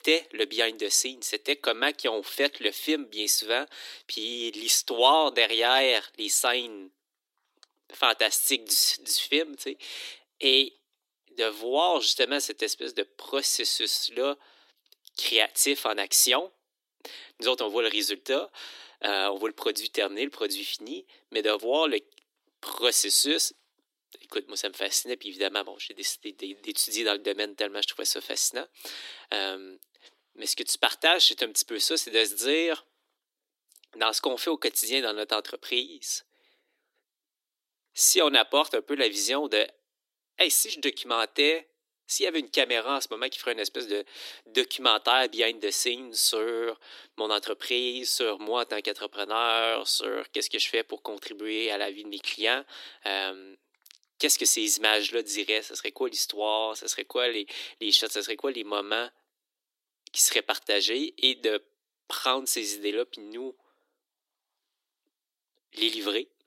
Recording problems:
thin; somewhat; fading below 300 Hz

